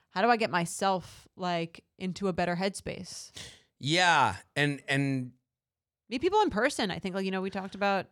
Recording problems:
none

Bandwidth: 18 kHz